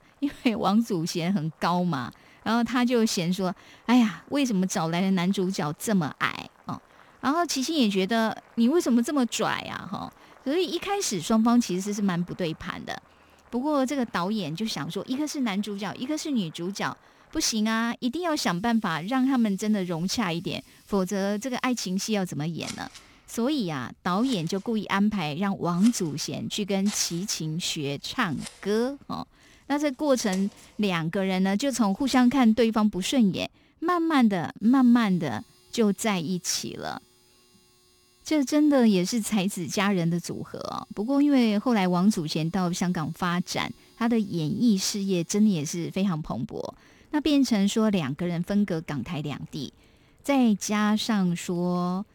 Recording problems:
household noises; faint; throughout; 25 dB below the speech

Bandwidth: 18.5 kHz